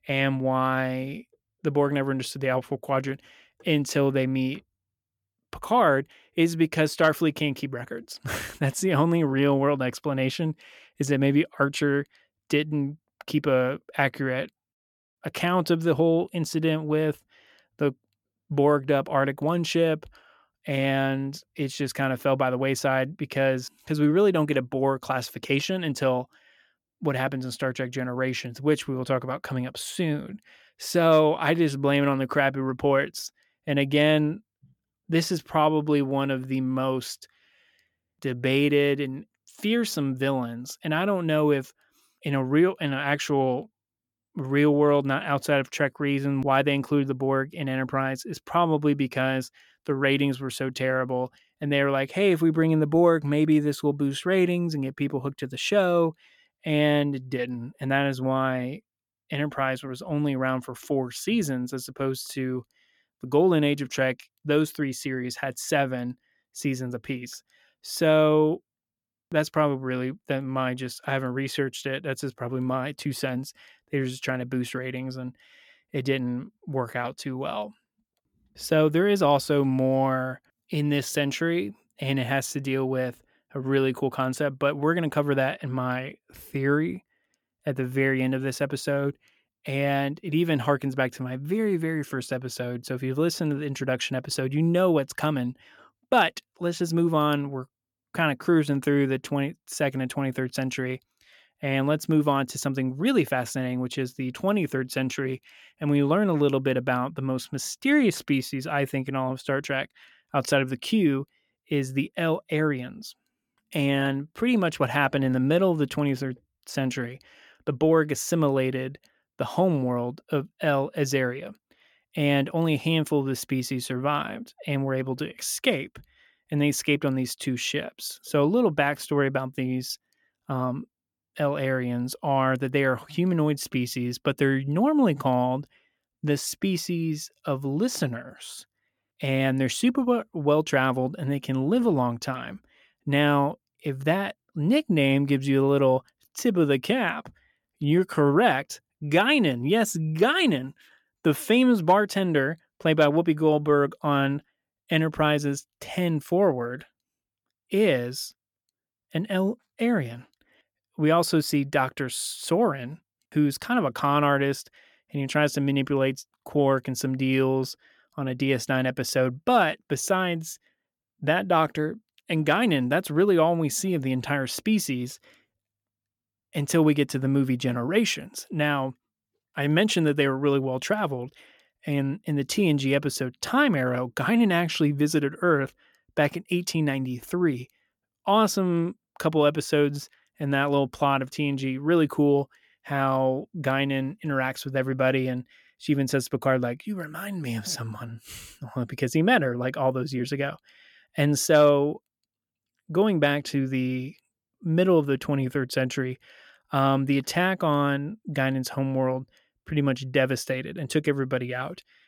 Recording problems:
none

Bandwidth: 17.5 kHz